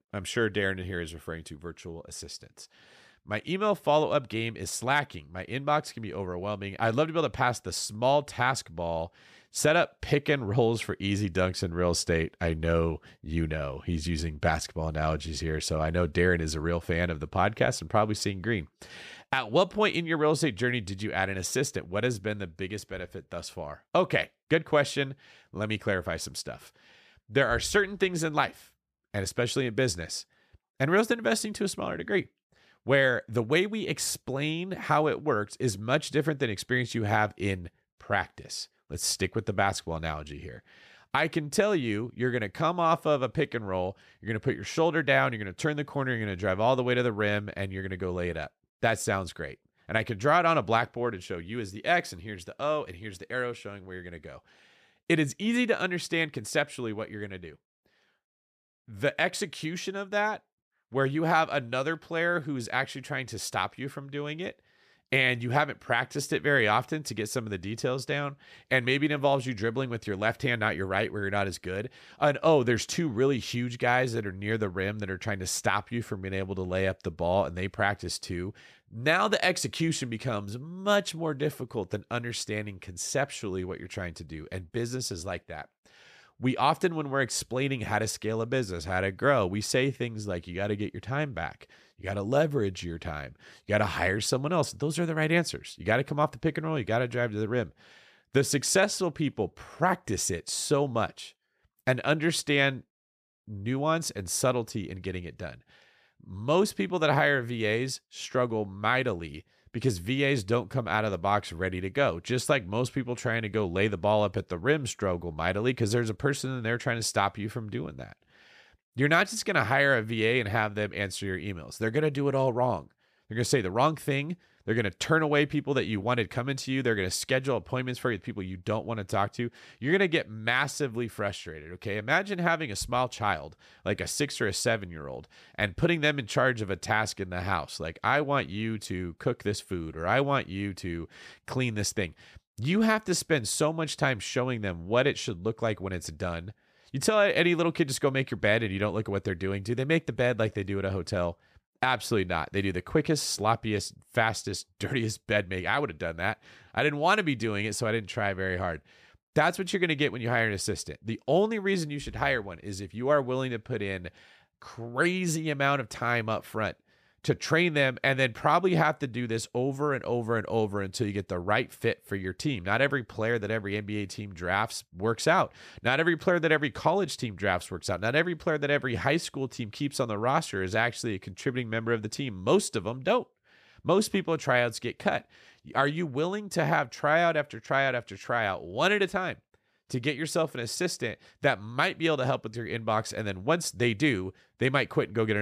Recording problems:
abrupt cut into speech; at the end

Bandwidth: 14.5 kHz